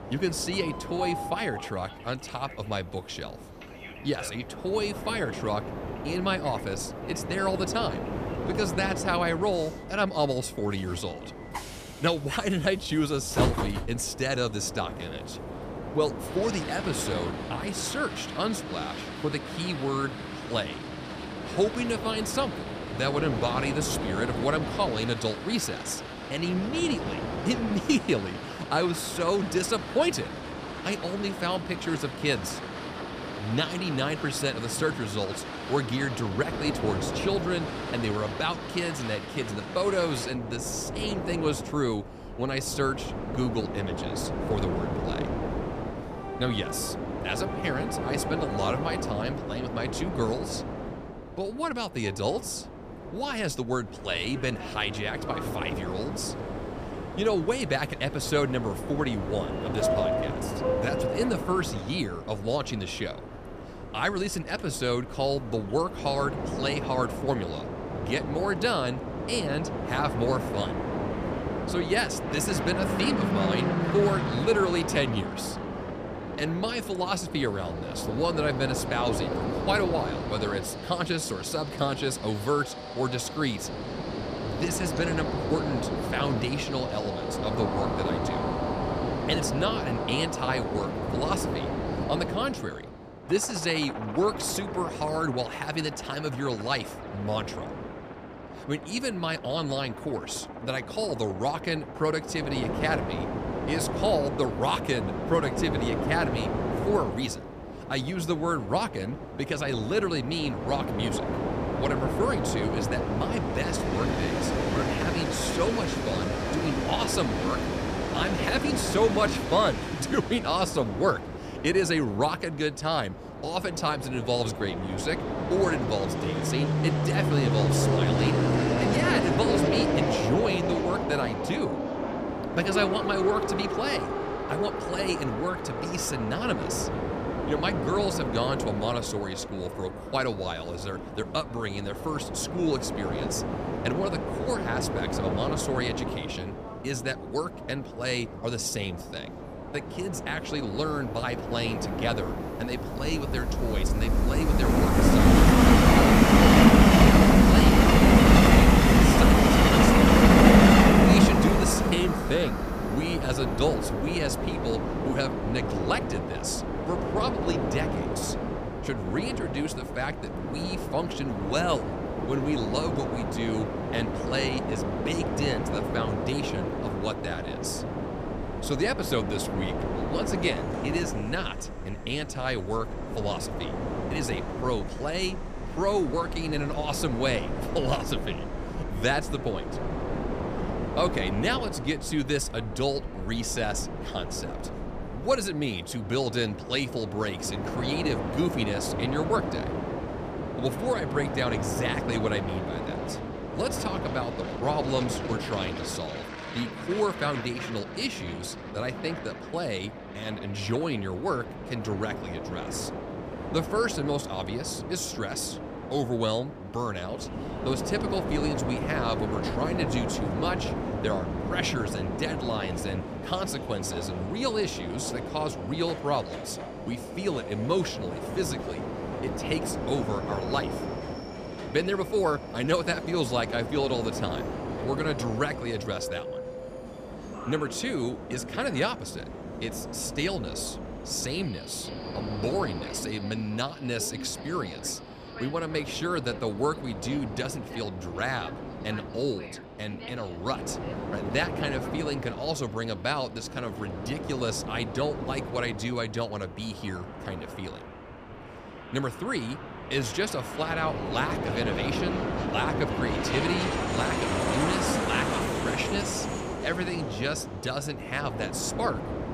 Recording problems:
train or aircraft noise; very loud; throughout; 1 dB above the speech

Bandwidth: 14.5 kHz